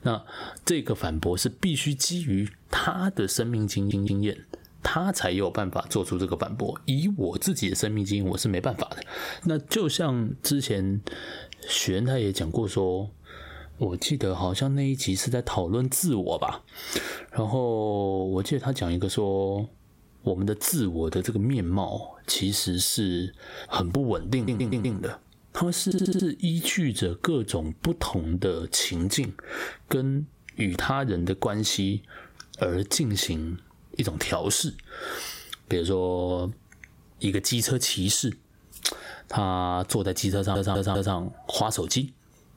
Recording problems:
squashed, flat; somewhat
audio stuttering; 4 times, first at 4 s

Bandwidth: 16 kHz